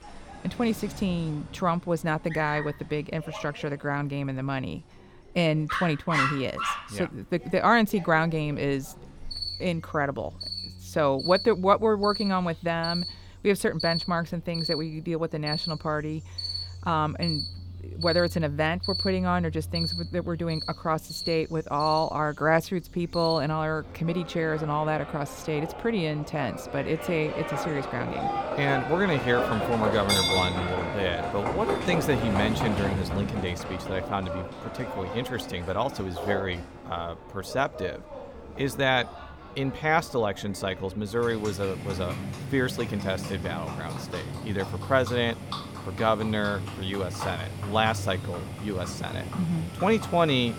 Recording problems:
animal sounds; loud; throughout; 5 dB below the speech

